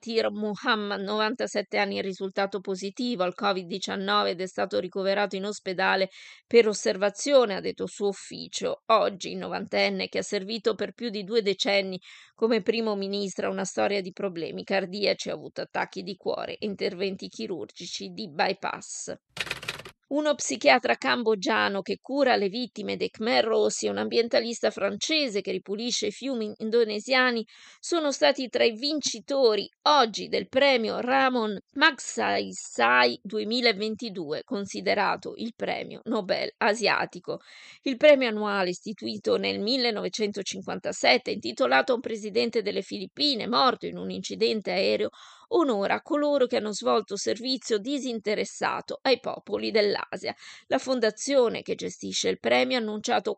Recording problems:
none

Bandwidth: 13 kHz